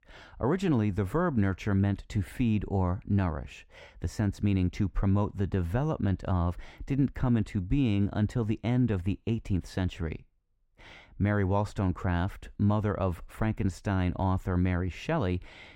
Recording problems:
muffled; slightly; fading above 3.5 kHz

